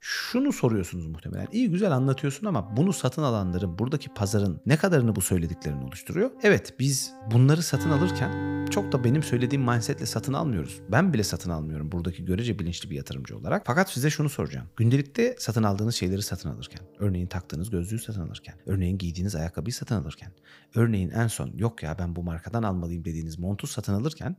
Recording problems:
background music; noticeable; throughout; 10 dB below the speech

